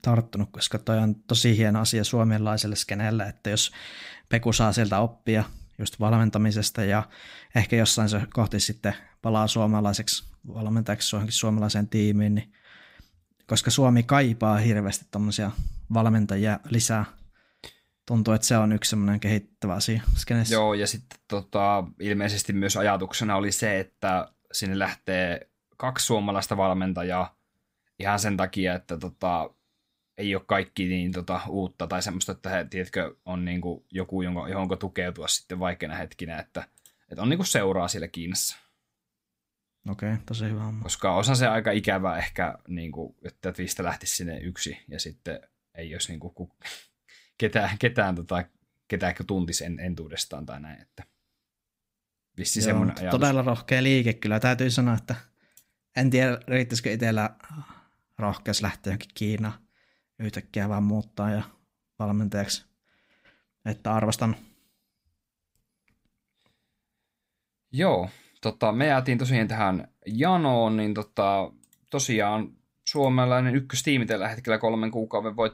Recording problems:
none

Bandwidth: 15.5 kHz